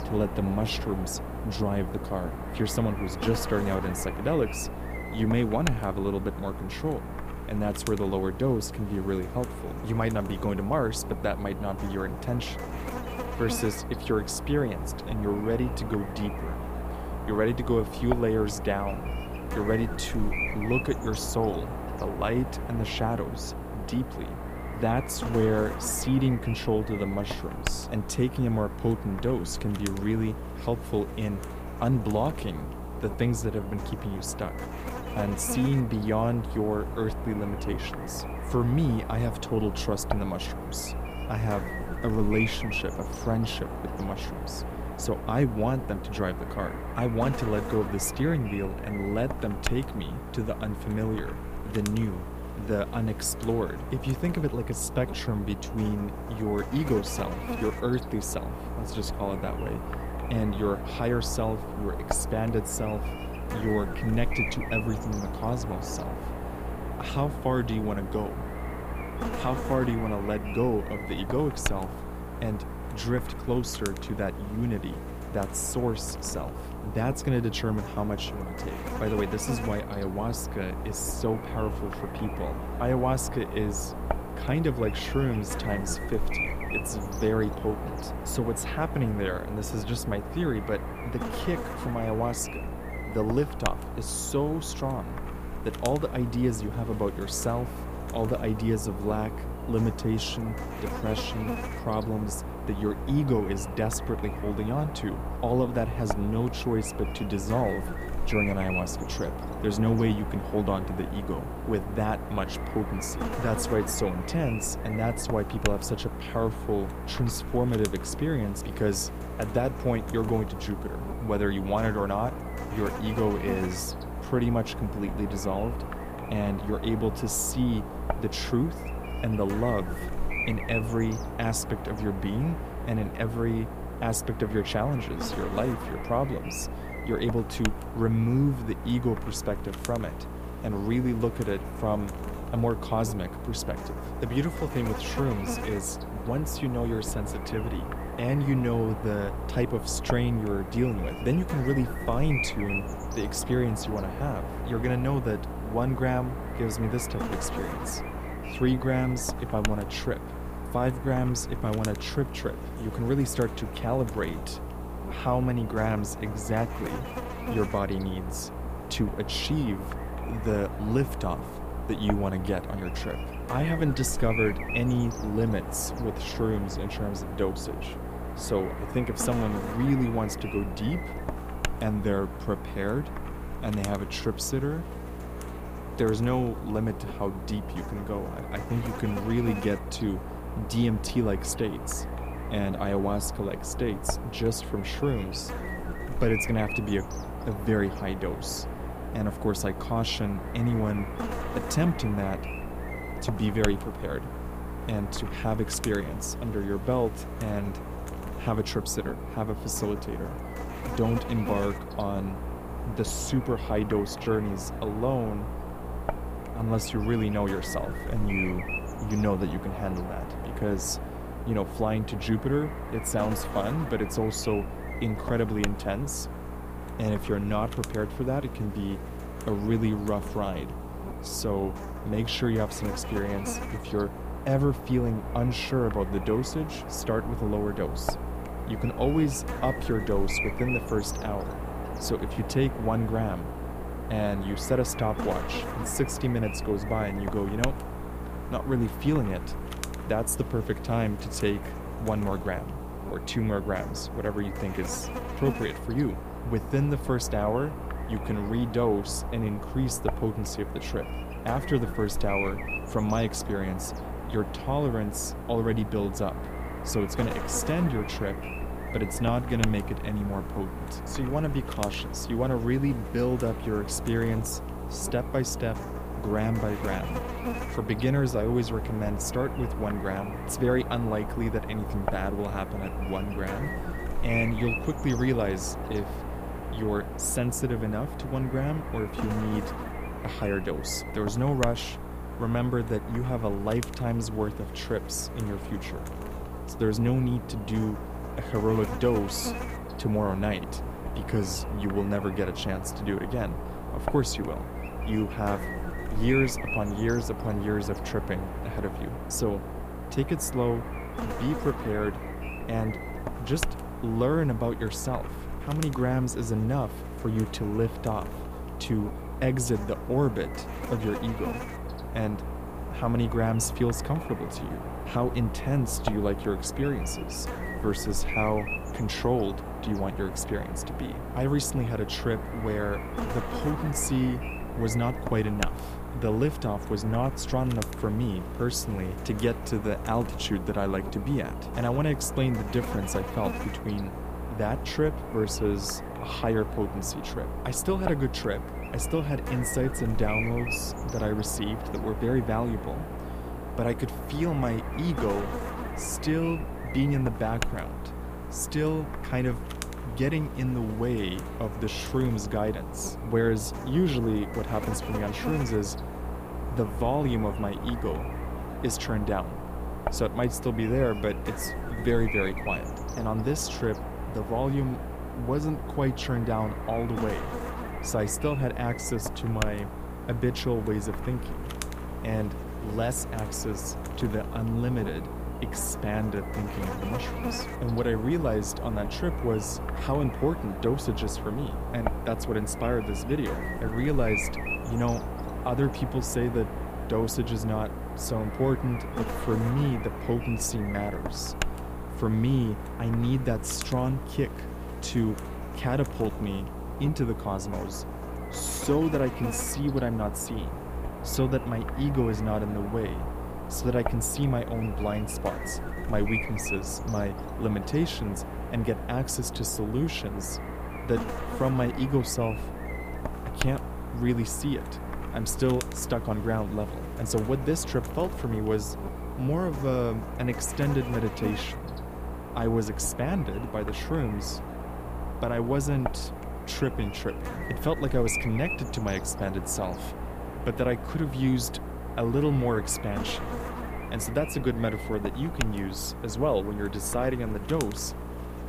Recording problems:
electrical hum; loud; throughout; 60 Hz, 5 dB below the speech

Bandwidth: 15 kHz